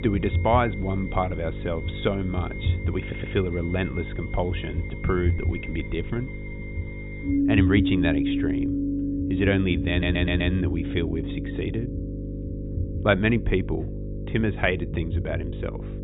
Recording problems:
high frequencies cut off; severe; nothing above 4 kHz
background music; loud; throughout; 4 dB below the speech
electrical hum; noticeable; throughout; 50 Hz, 15 dB below the speech
low rumble; noticeable; throughout; 20 dB below the speech
audio stuttering; at 3 s and at 10 s

